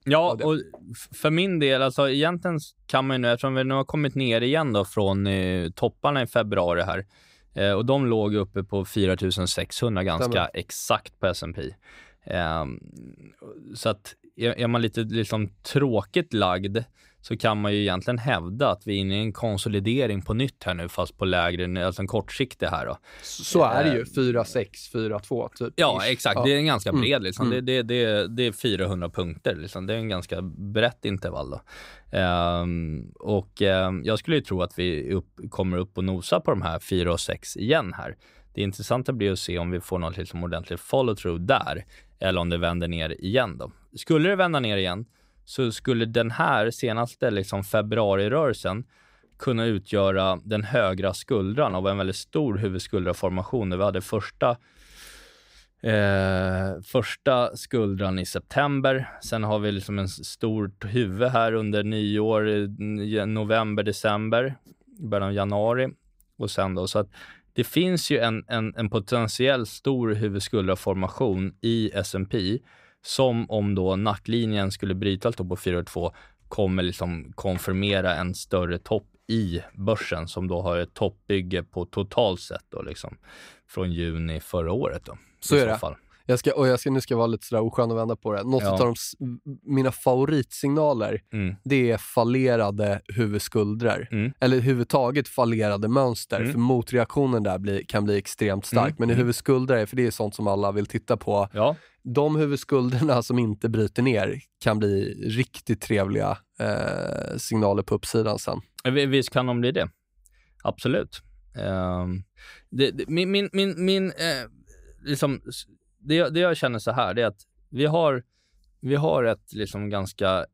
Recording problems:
none

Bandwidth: 15.5 kHz